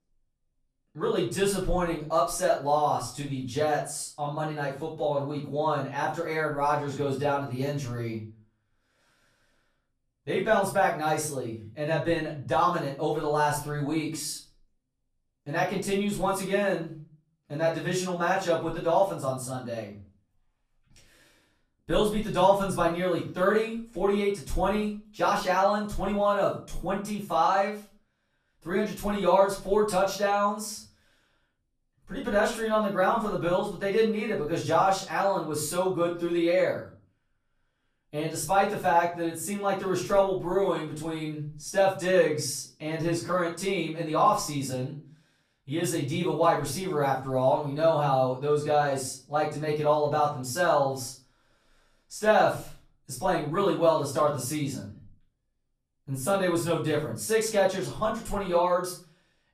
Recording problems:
off-mic speech; far
room echo; slight; dies away in 0.3 s

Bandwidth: 14.5 kHz